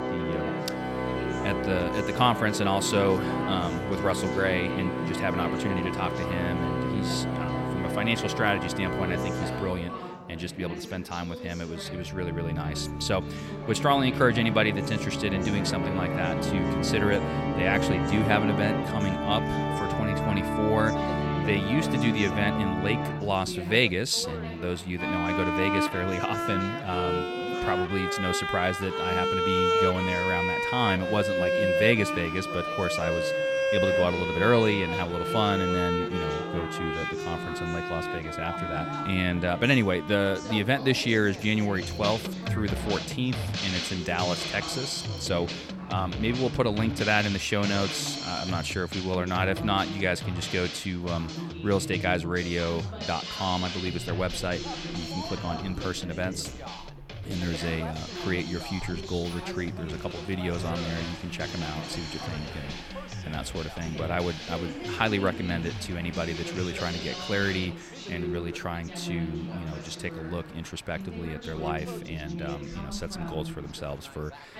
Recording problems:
background music; loud; throughout; 2 dB below the speech
background chatter; noticeable; throughout; 2 voices, 10 dB below the speech
train or aircraft noise; faint; throughout; 20 dB below the speech

